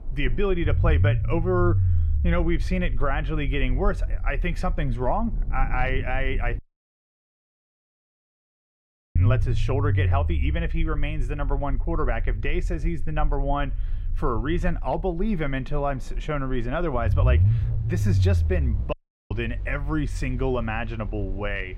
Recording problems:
muffled; slightly; fading above 4 kHz
rain or running water; noticeable; throughout; 15 dB below the speech
low rumble; noticeable; throughout; 15 dB below the speech
audio cutting out; at 6.5 s for 2.5 s and at 19 s

